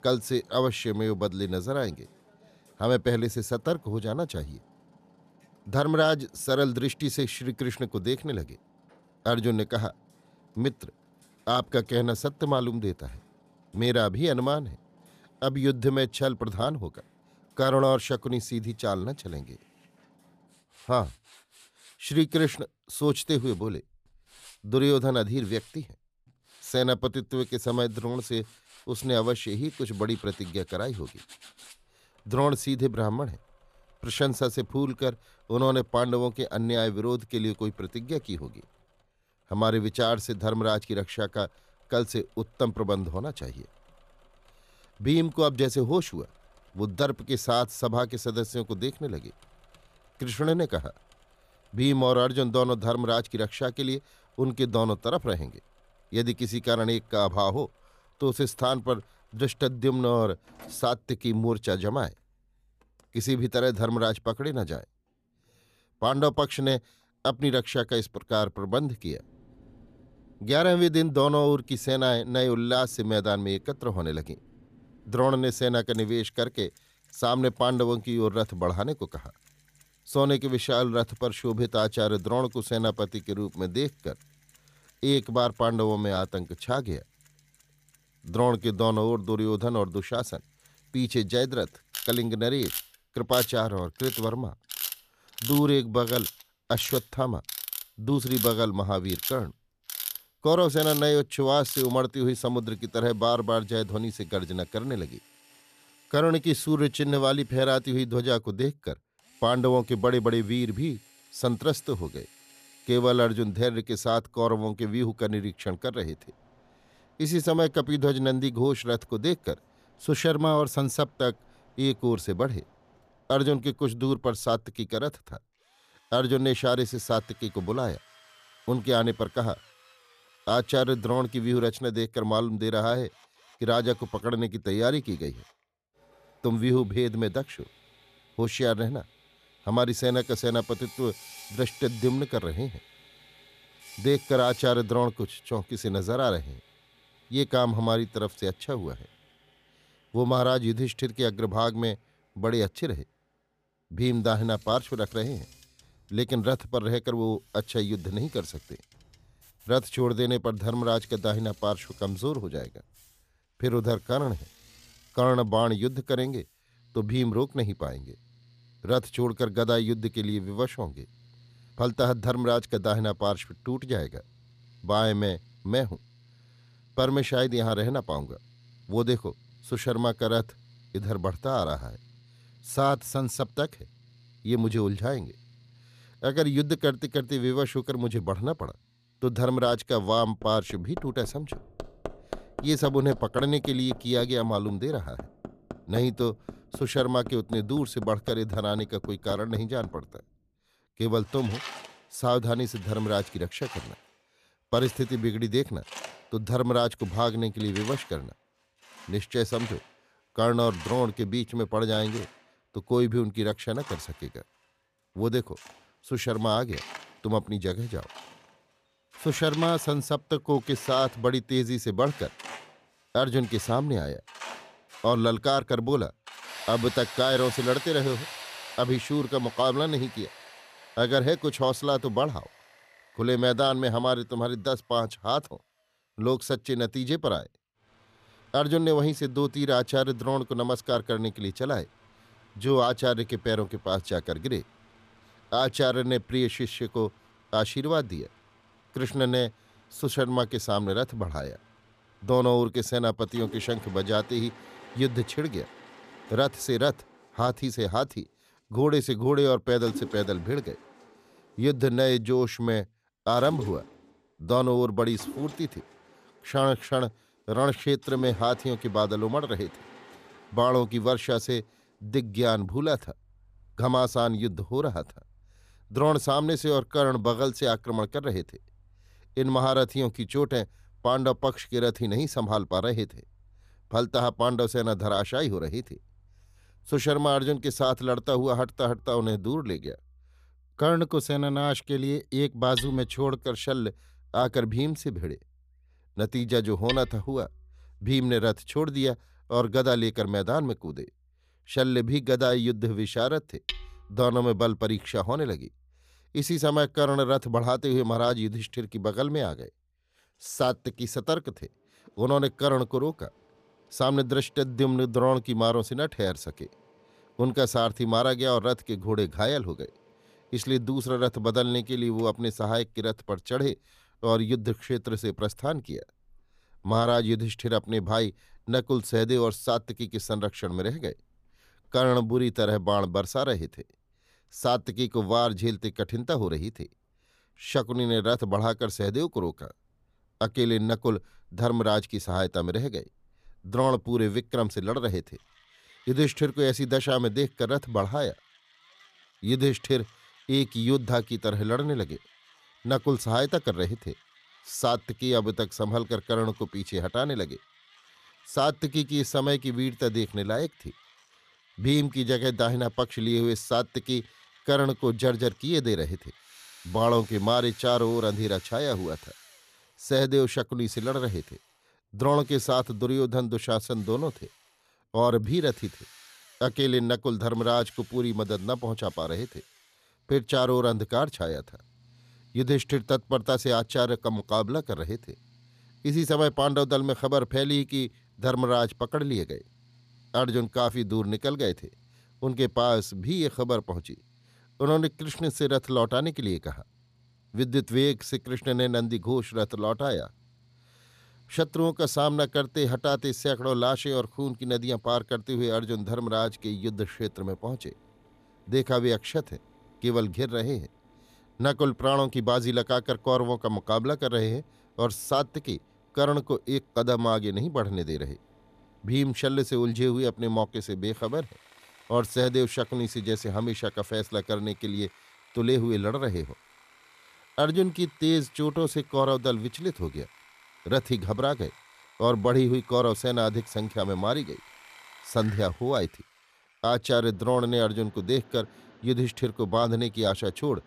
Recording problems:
machinery noise; noticeable; throughout; 15 dB below the speech

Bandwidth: 14.5 kHz